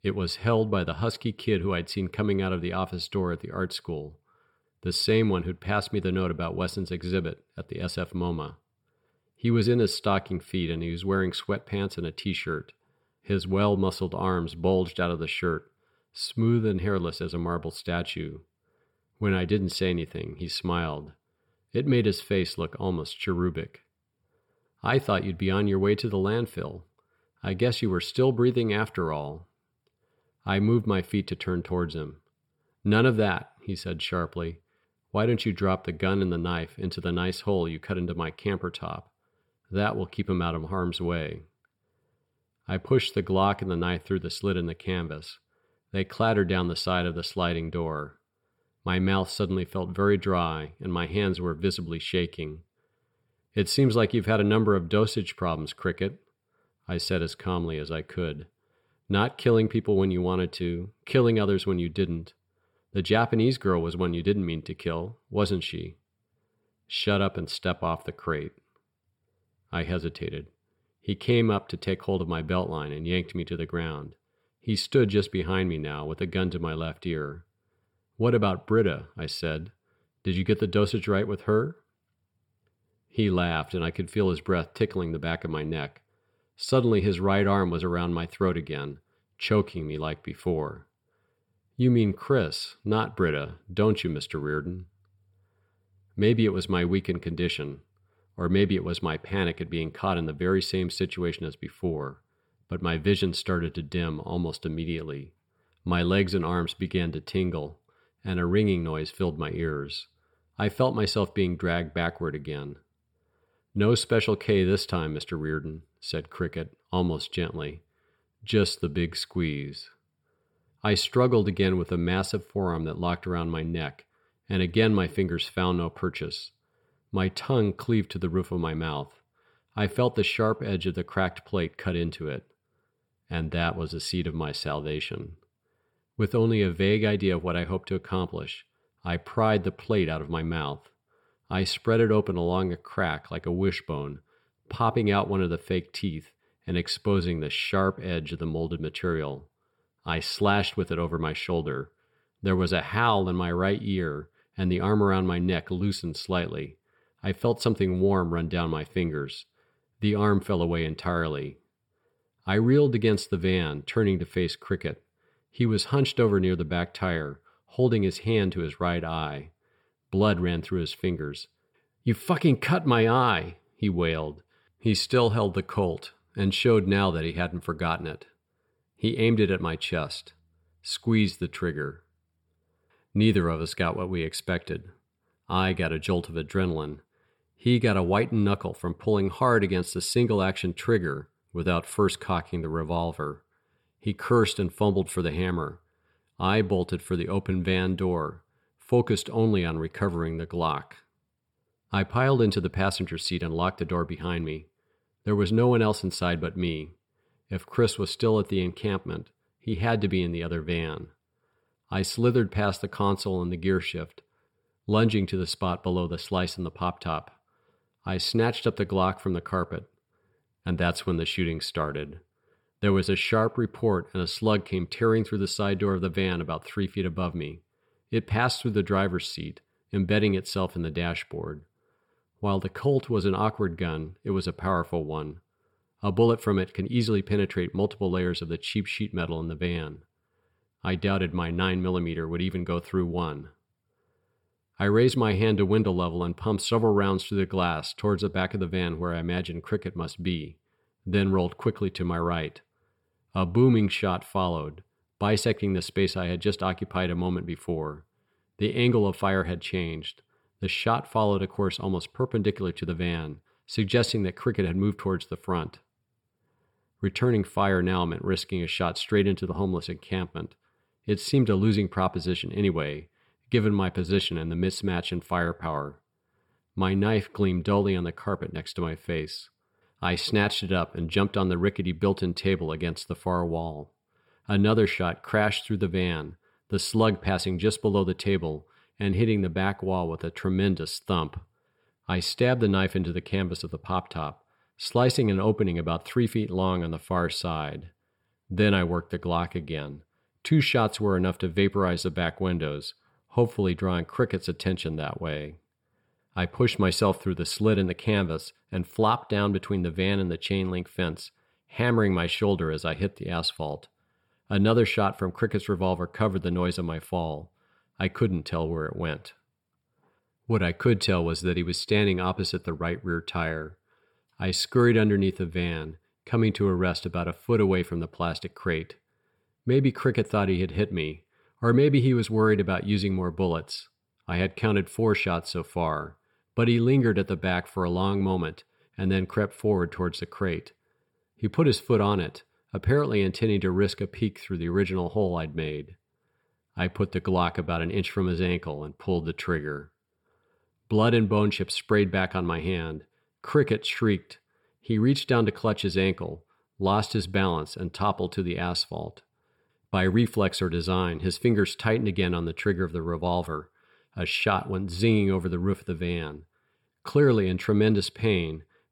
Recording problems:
none

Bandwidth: 18.5 kHz